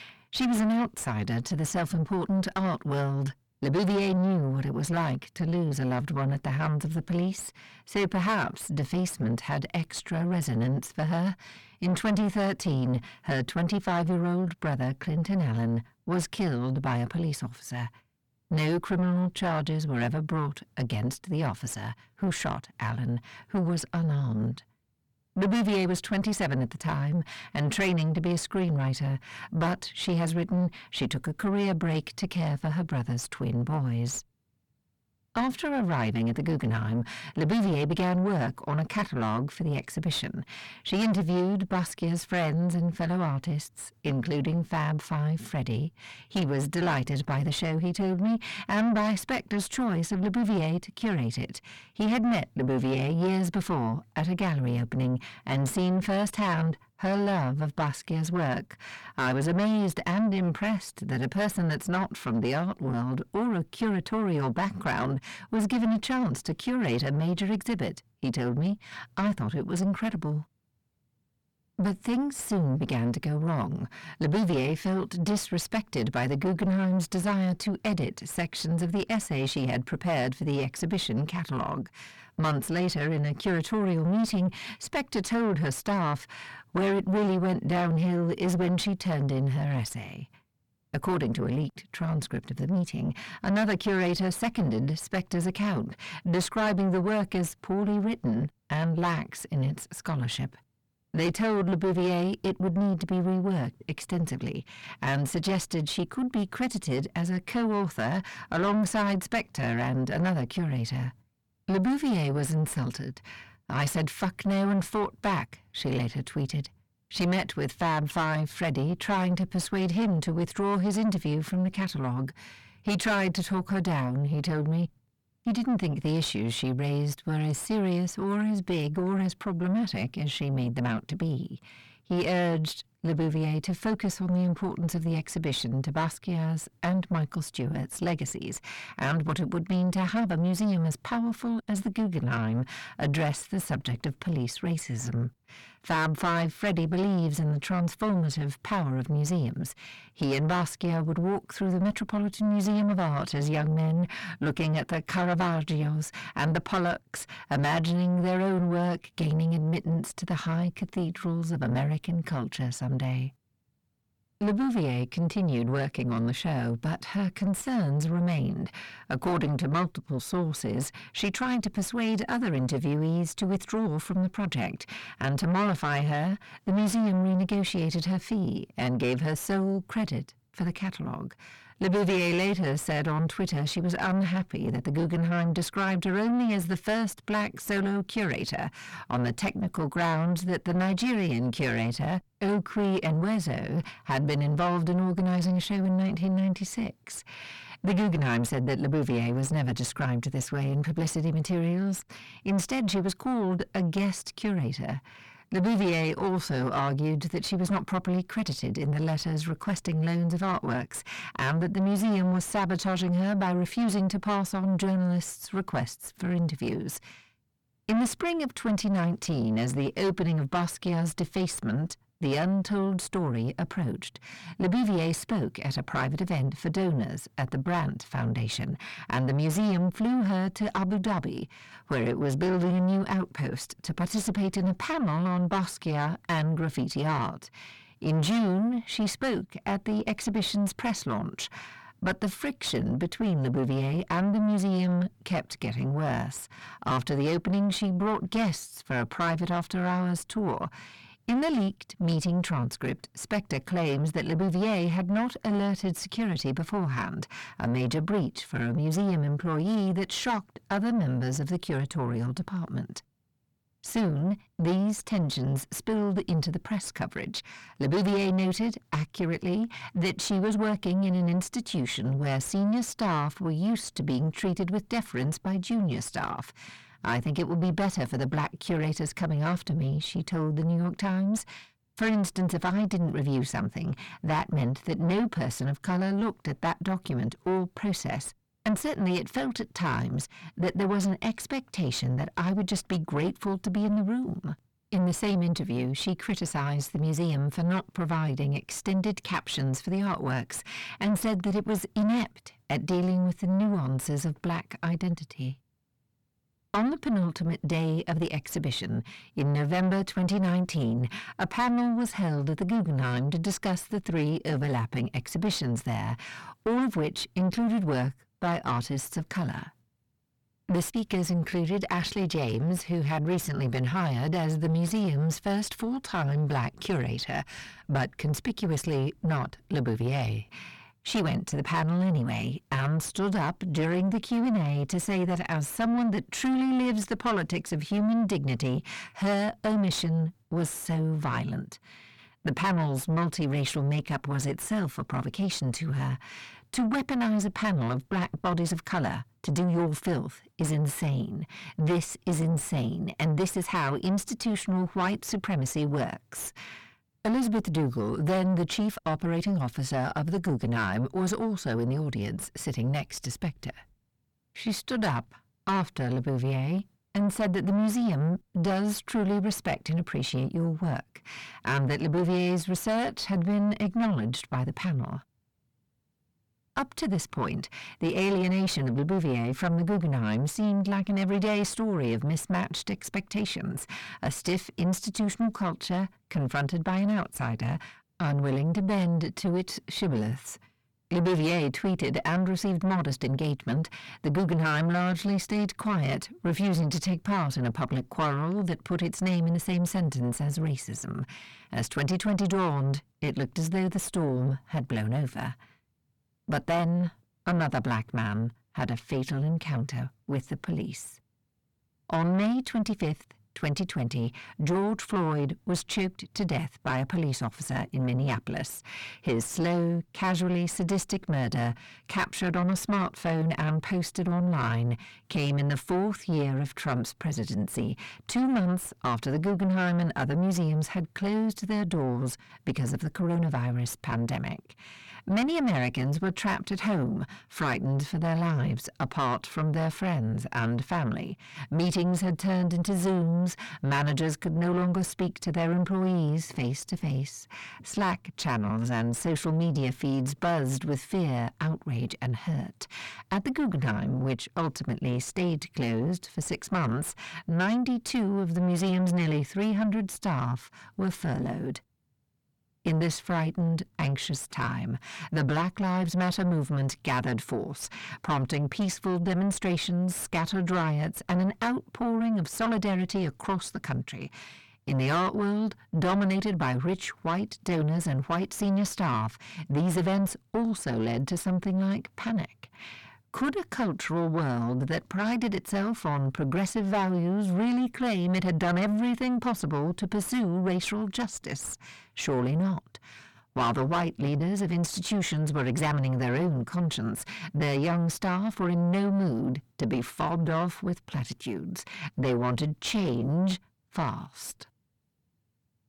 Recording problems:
distortion; heavy; 6 dB below the speech

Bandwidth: 18.5 kHz